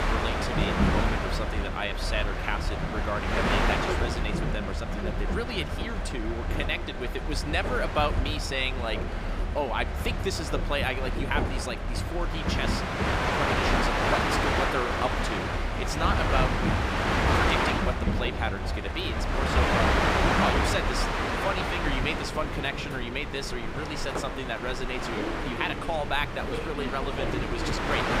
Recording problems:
train or aircraft noise; very loud; throughout; 4 dB above the speech

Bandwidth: 15.5 kHz